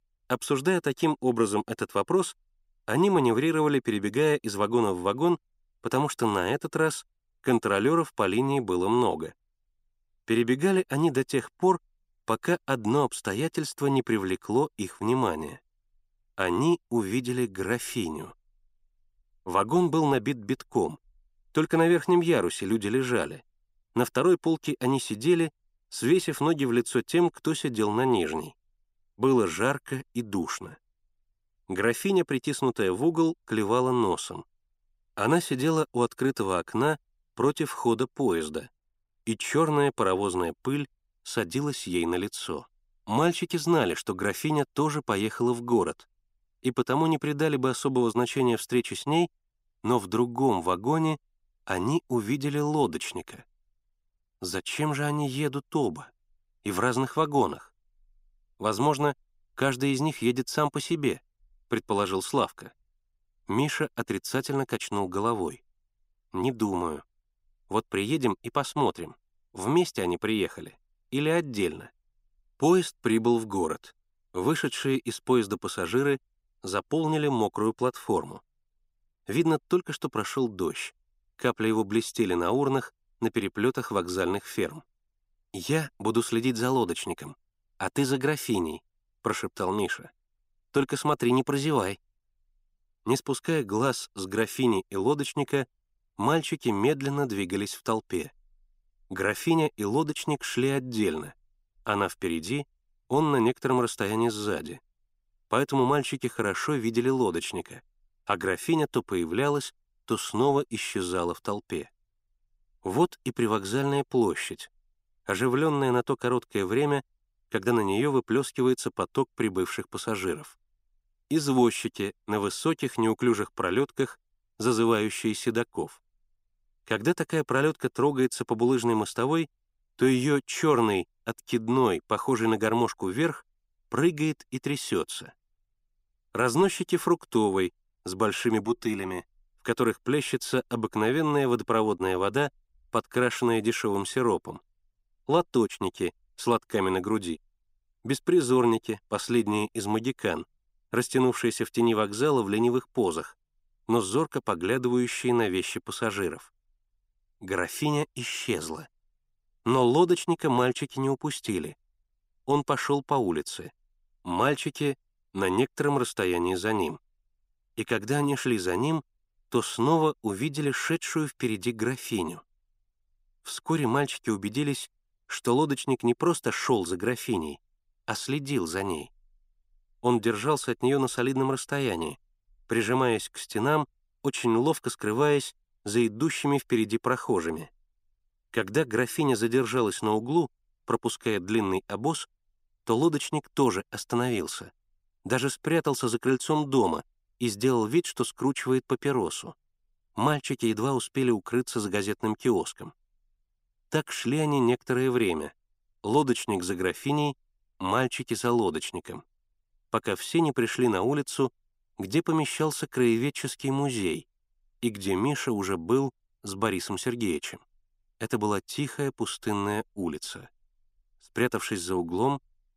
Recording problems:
none

